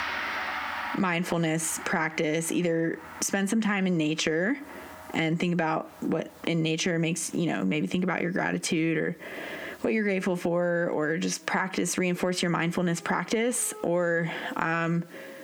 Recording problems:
squashed, flat; heavily, background pumping
background music; noticeable; throughout; 10 dB below the speech

